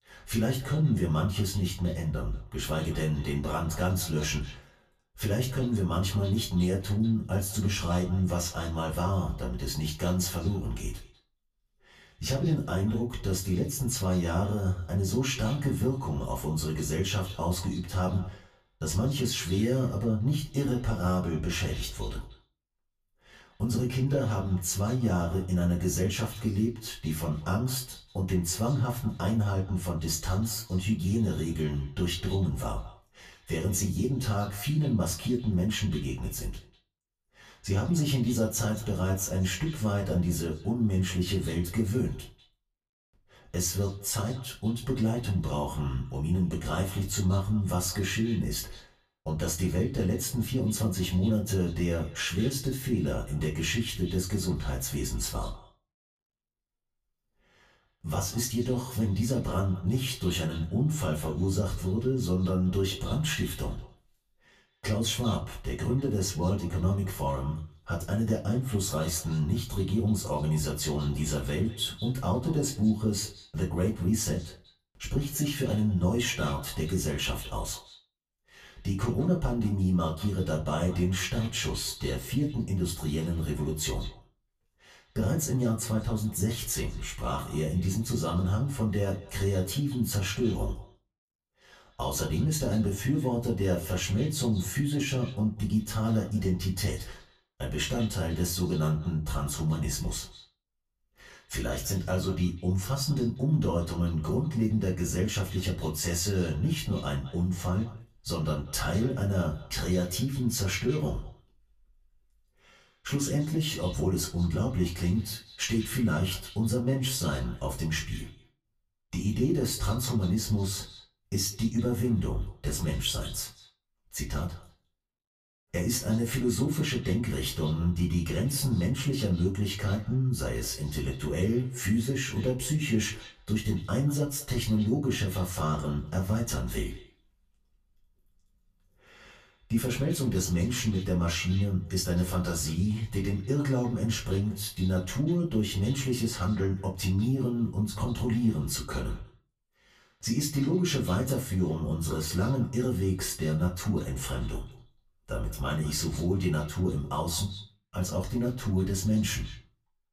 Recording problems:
off-mic speech; far
echo of what is said; faint; throughout; 200 ms later, 20 dB below the speech
room echo; very slight; dies away in 0.3 s

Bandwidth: 14.5 kHz